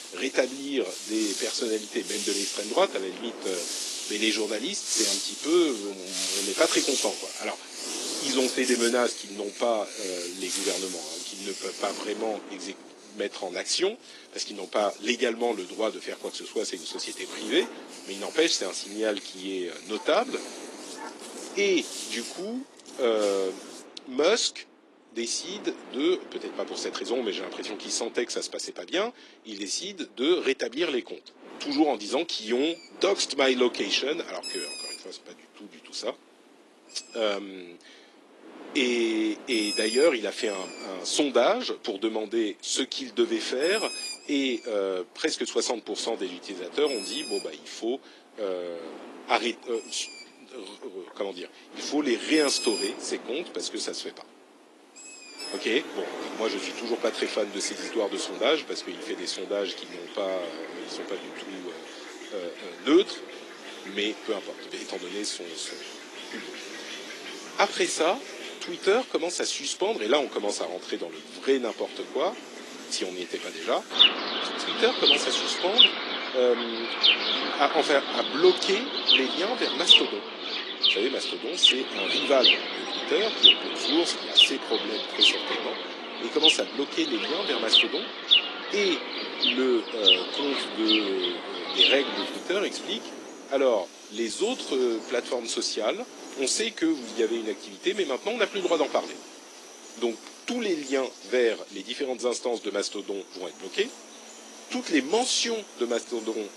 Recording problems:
thin; somewhat; fading below 300 Hz
garbled, watery; slightly
animal sounds; very loud; throughout; 3 dB above the speech
wind noise on the microphone; occasional gusts; 20 dB below the speech

